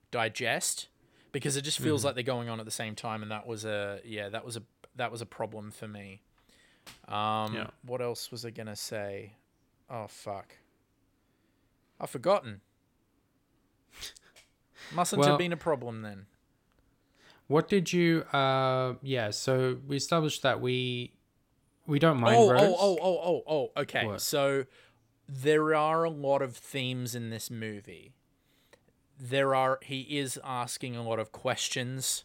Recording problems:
none

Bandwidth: 16.5 kHz